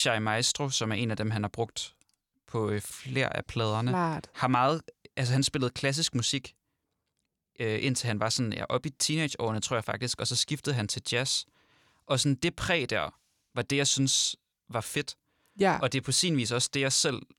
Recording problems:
abrupt cut into speech; at the start

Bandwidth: 18.5 kHz